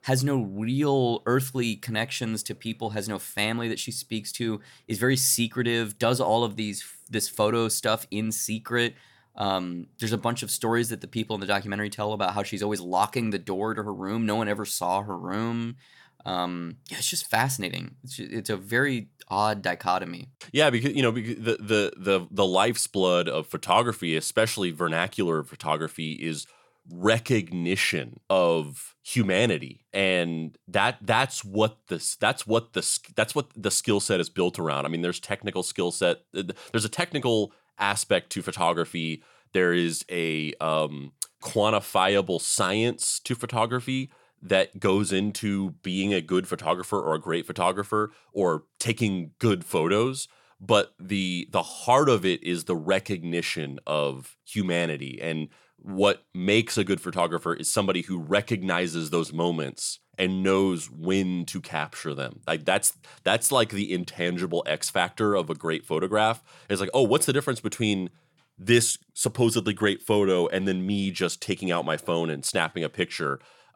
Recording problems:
none

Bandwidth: 17 kHz